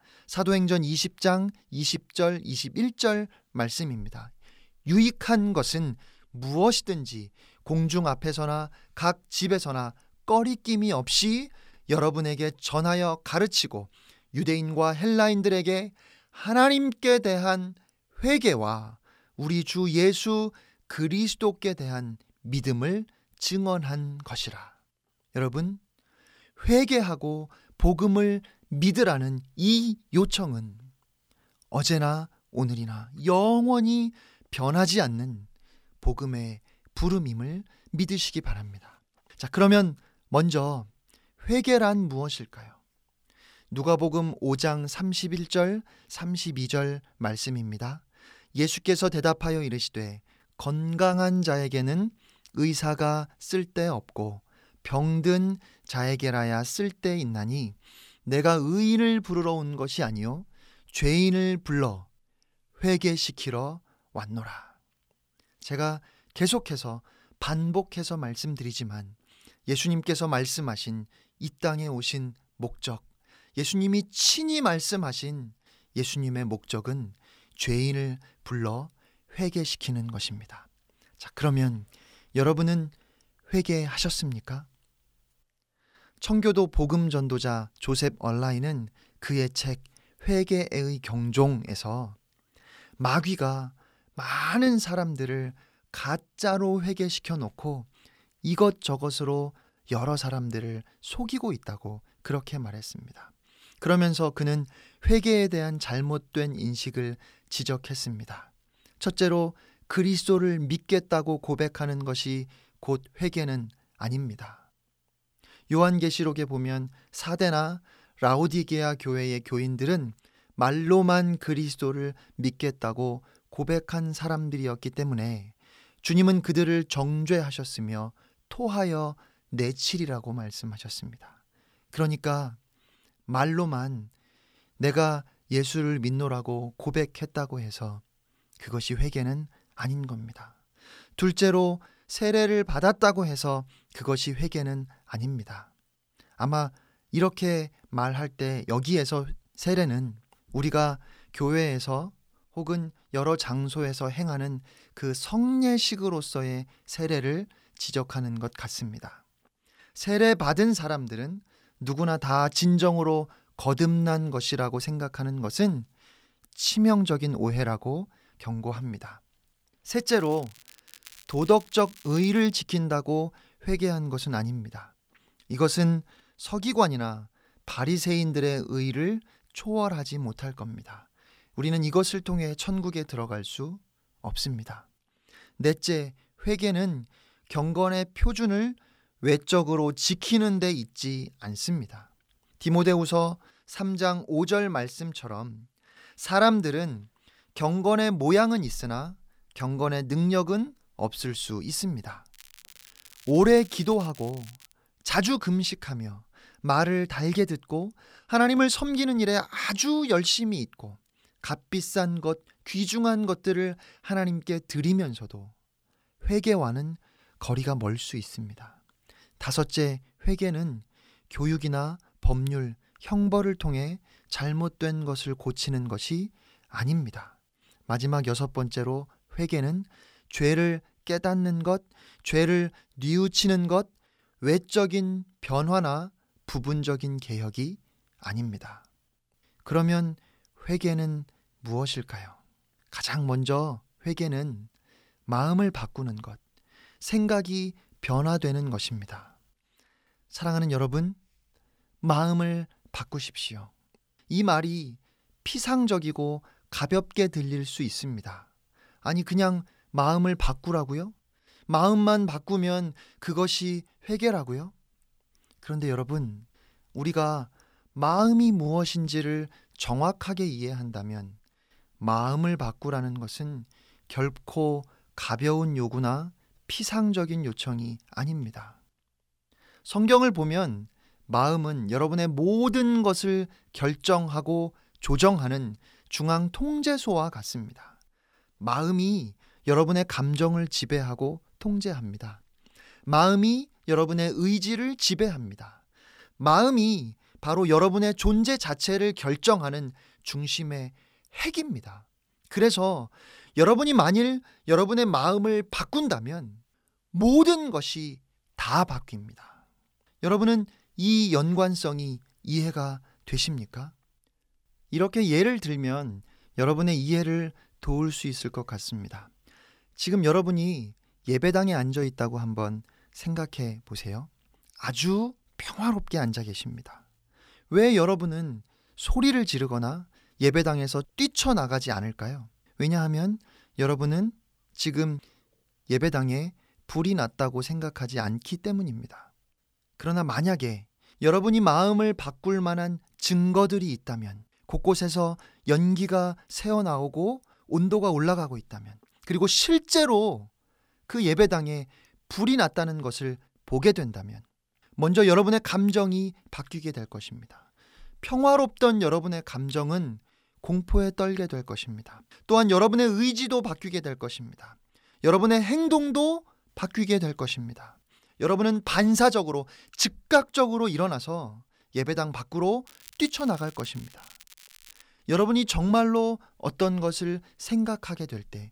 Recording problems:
crackling; faint; from 2:50 to 2:53, from 3:22 to 3:25 and from 6:13 to 6:15; 25 dB below the speech

